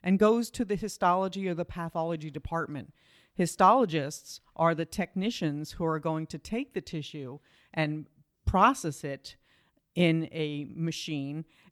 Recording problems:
none

